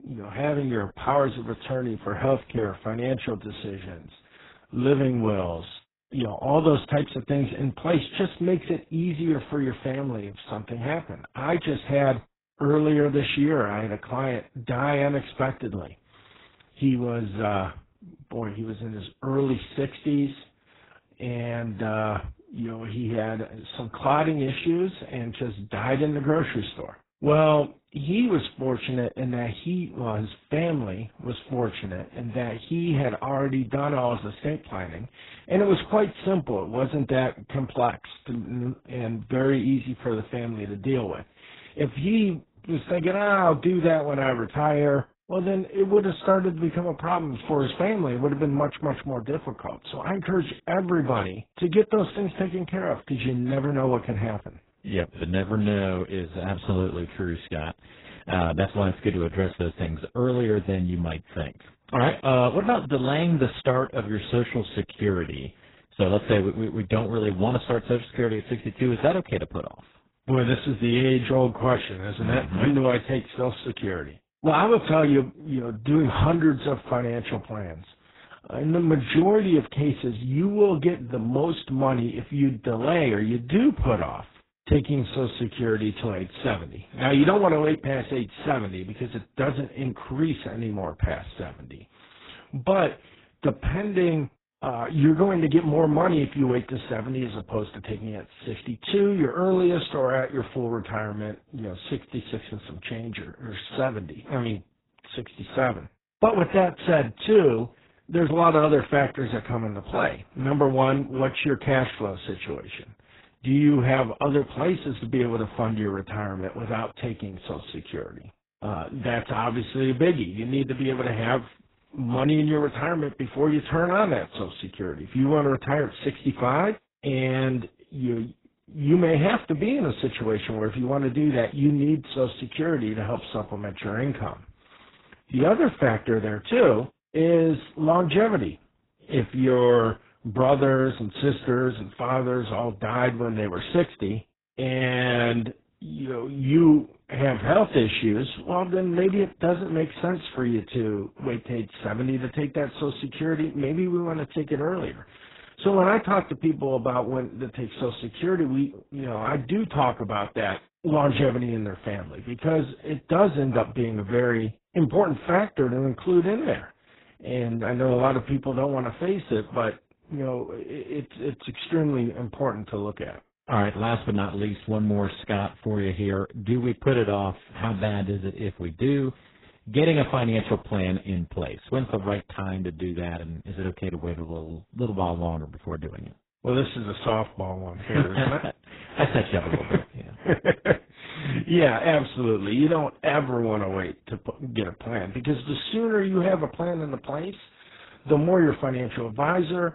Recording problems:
garbled, watery; badly; nothing above 4 kHz

